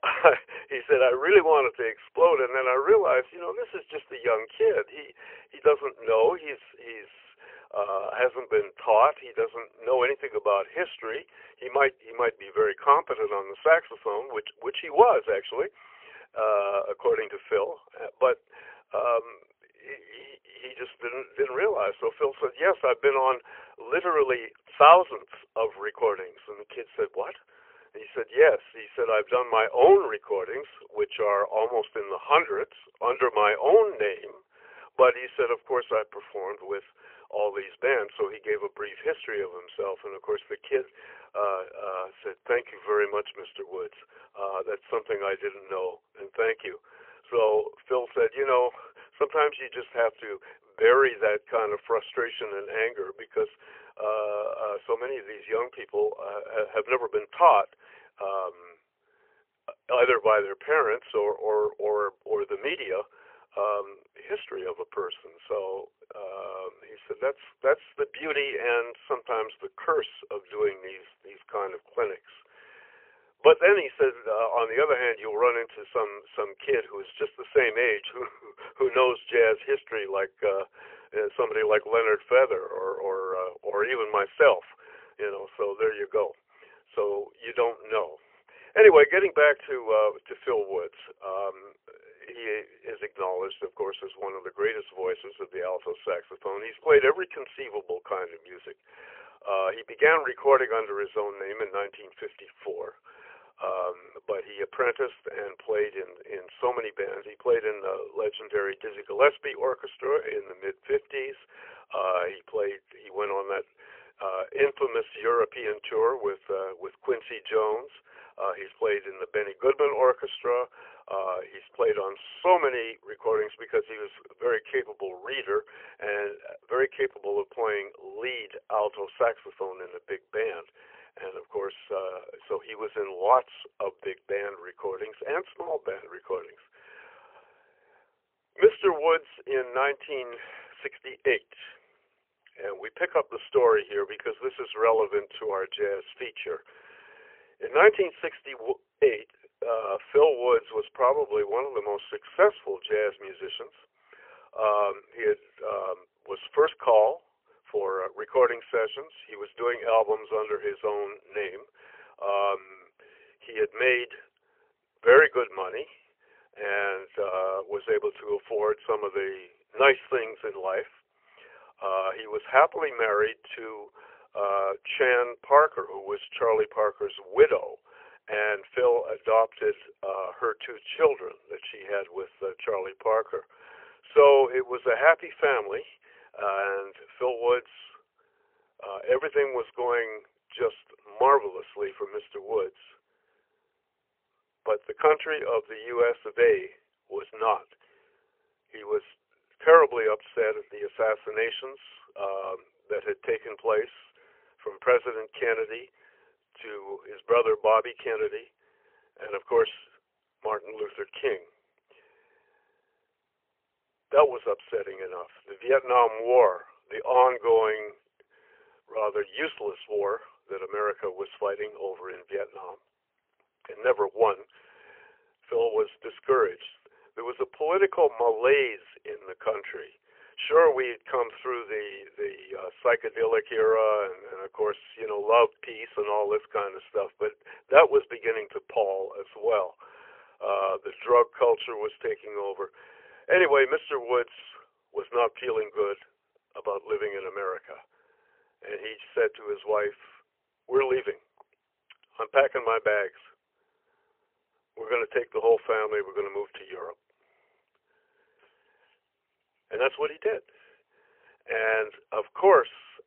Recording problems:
phone-call audio; poor line; nothing above 3 kHz

